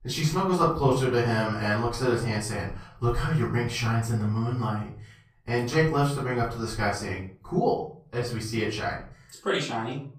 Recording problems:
off-mic speech; far
room echo; slight; dies away in 0.4 s

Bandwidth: 15 kHz